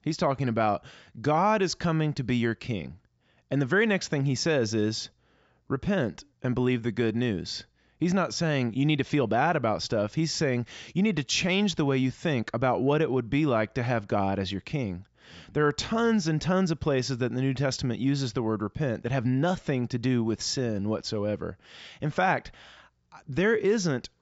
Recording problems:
high frequencies cut off; noticeable; nothing above 8 kHz

